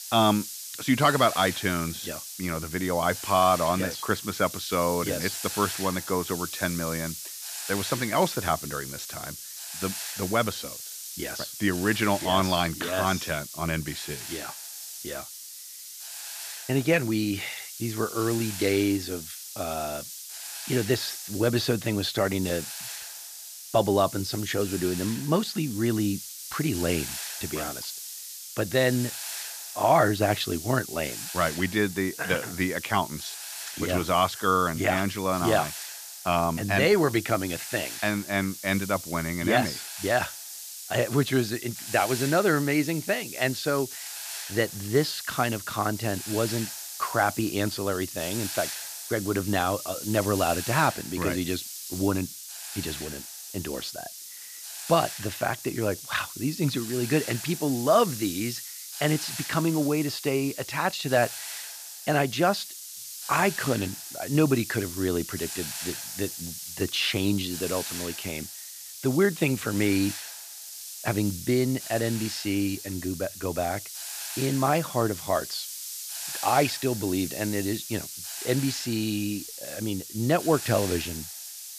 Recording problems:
hiss; loud; throughout; 8 dB below the speech

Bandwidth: 14.5 kHz